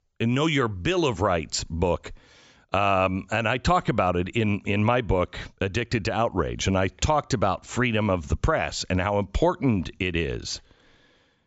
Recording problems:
high frequencies cut off; noticeable; nothing above 8 kHz

